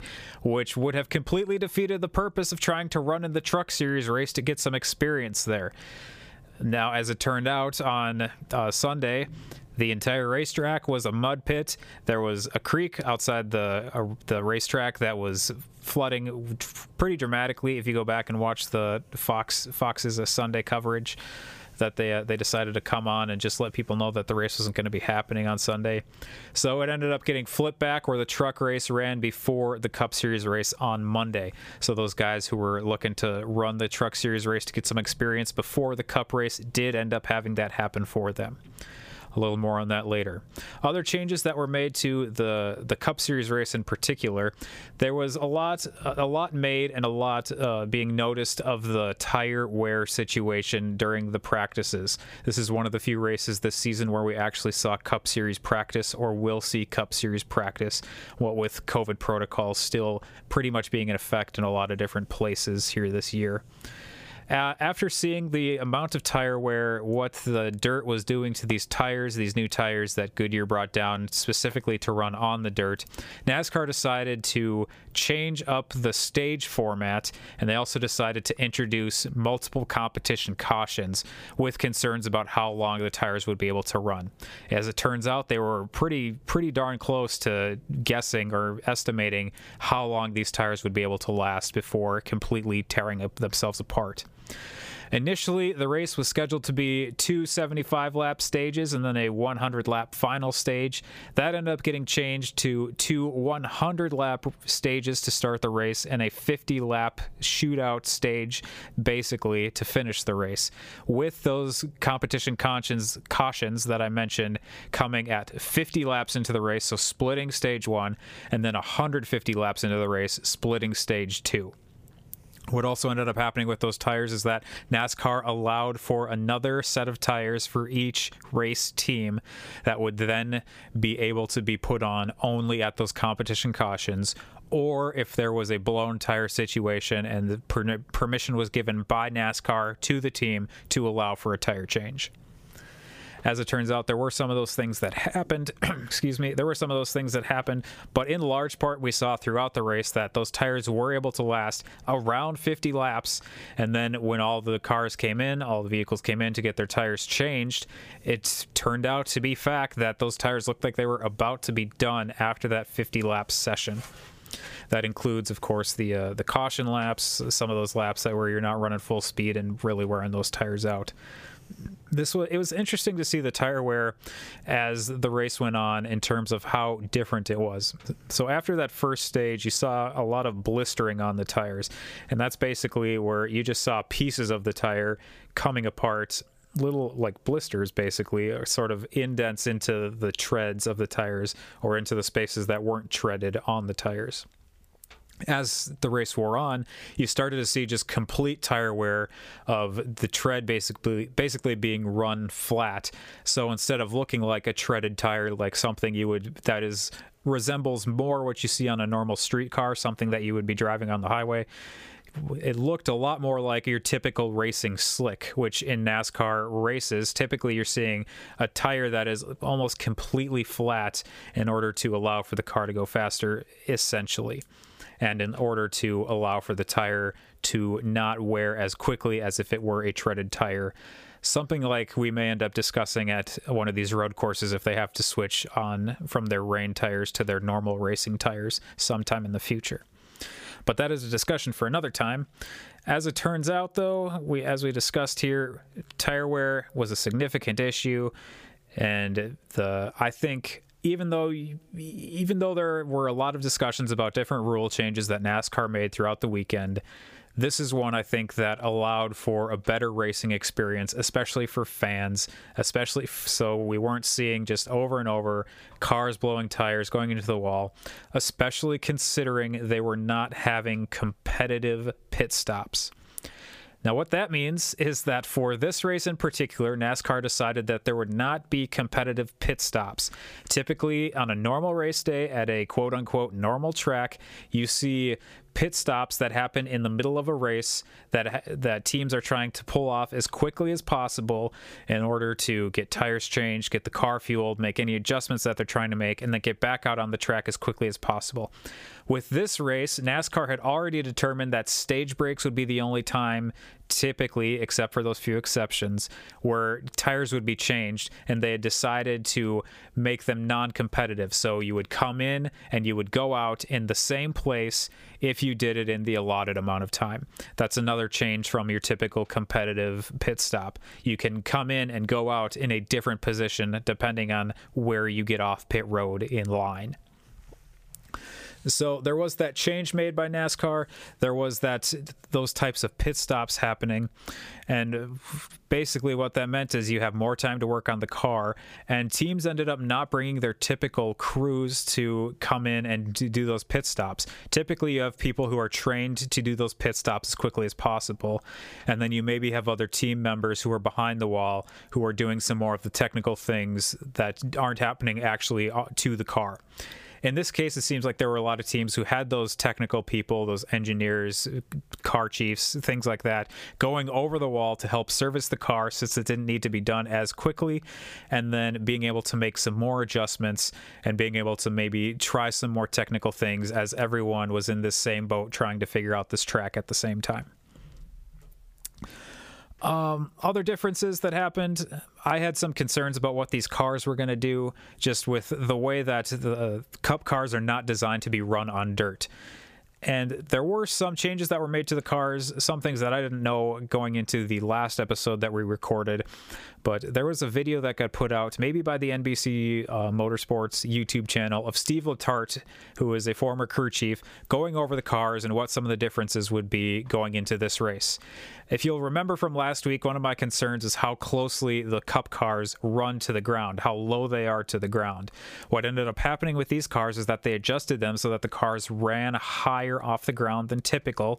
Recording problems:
squashed, flat; somewhat

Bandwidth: 15 kHz